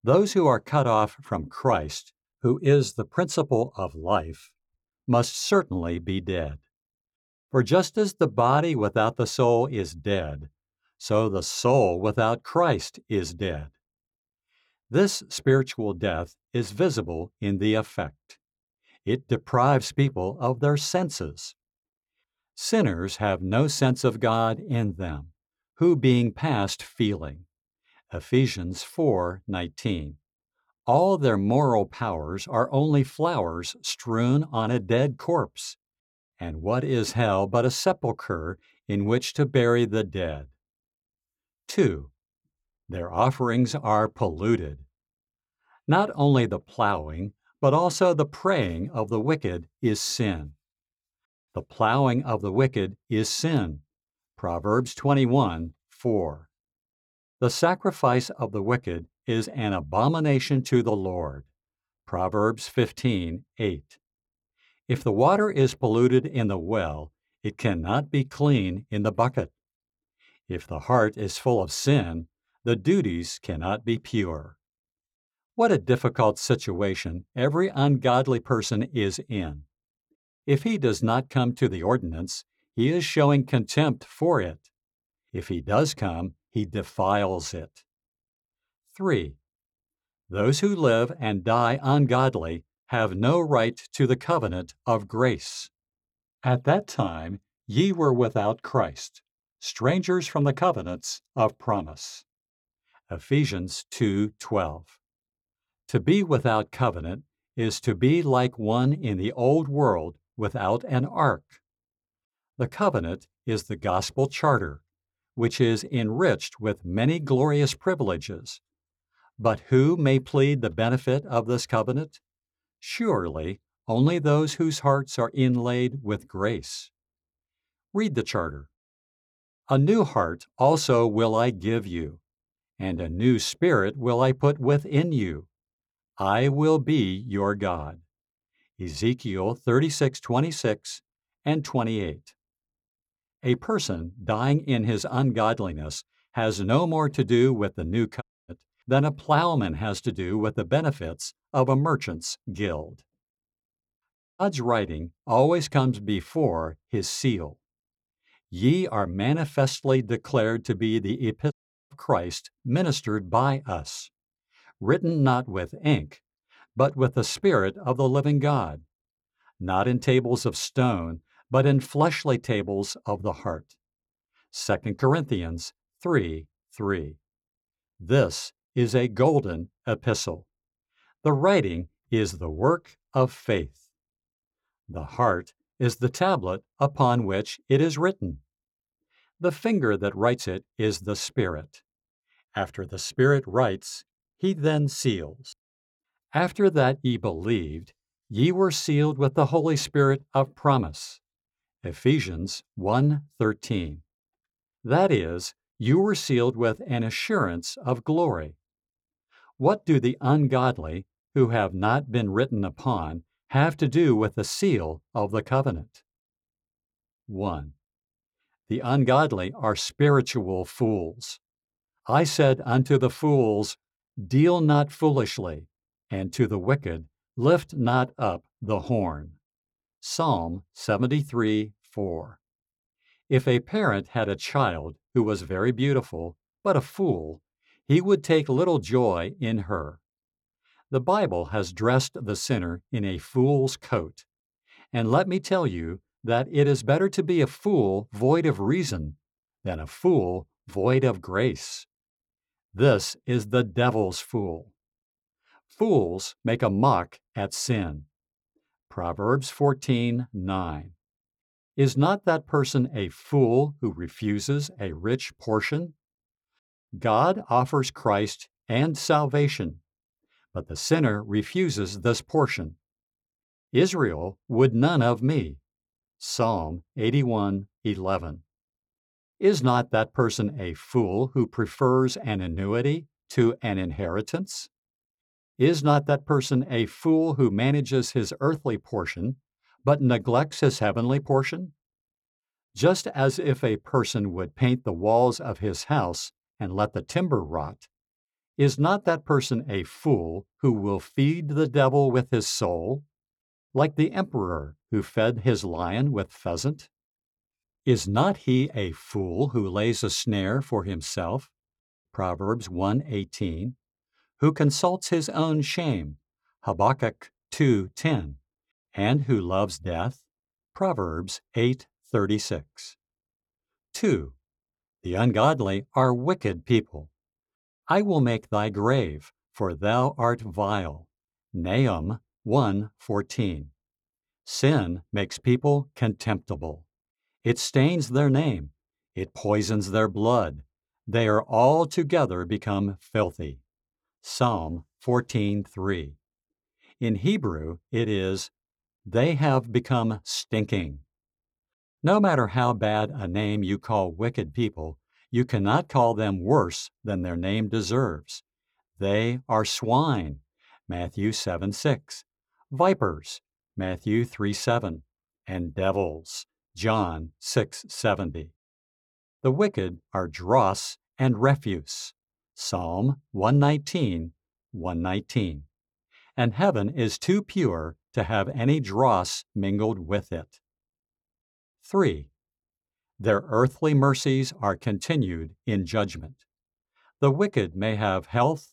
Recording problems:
audio cutting out; at 2:28, at 2:34 and at 2:42

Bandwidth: 18 kHz